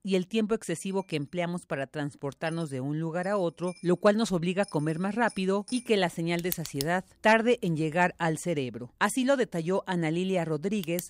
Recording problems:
household noises; noticeable; throughout; 15 dB below the speech

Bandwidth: 15.5 kHz